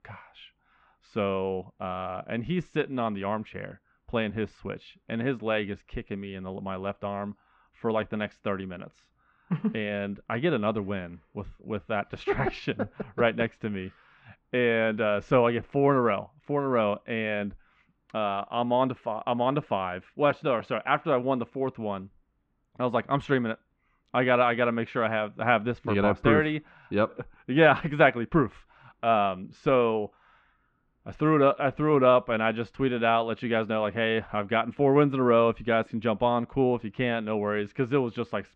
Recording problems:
muffled; very; fading above 2.5 kHz

